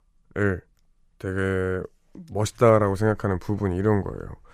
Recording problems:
none

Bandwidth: 14.5 kHz